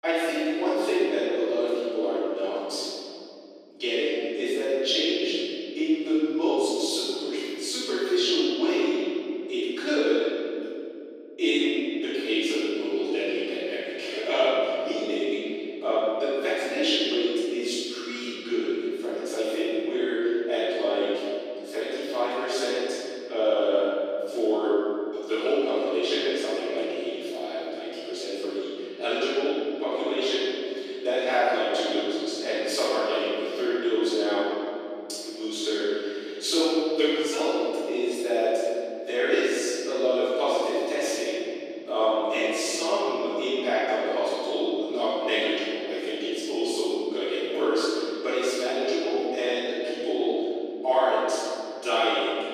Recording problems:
room echo; strong; dies away in 2.9 s
off-mic speech; far
thin; somewhat; fading below 300 Hz

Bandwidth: 14.5 kHz